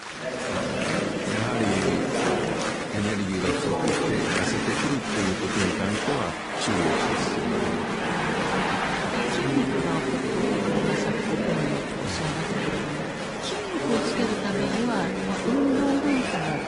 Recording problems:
garbled, watery; slightly; nothing above 10.5 kHz
chatter from many people; very loud; throughout; 4 dB above the speech
crackling; noticeable; from 8.5 to 11 s and at 16 s; 15 dB below the speech

